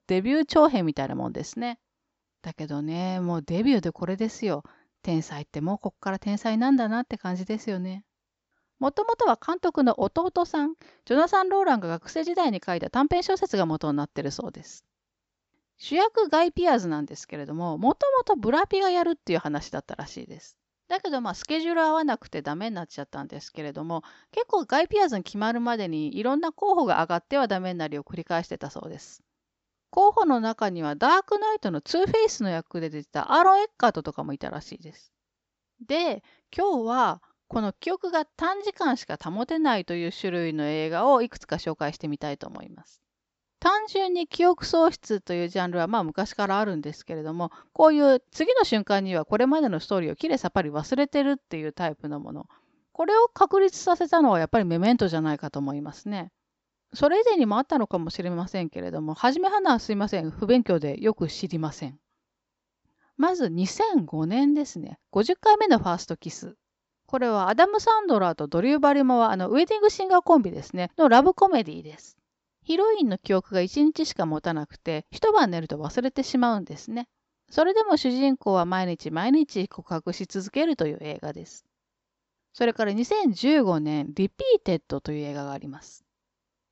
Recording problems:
high frequencies cut off; noticeable; nothing above 7.5 kHz

